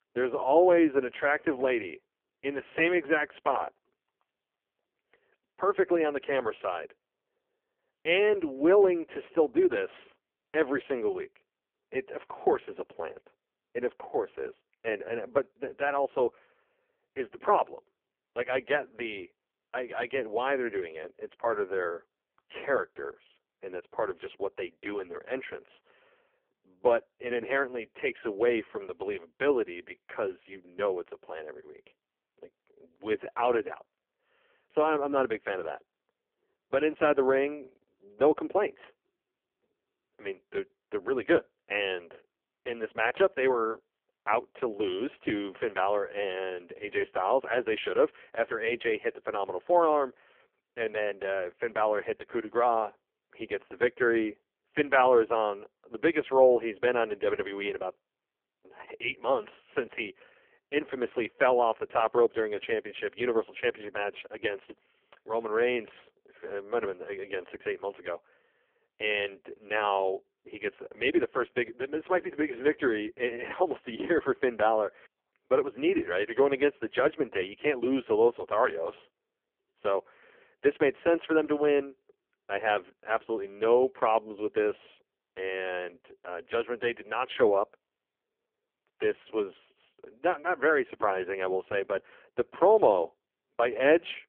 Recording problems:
phone-call audio; poor line; nothing above 3 kHz

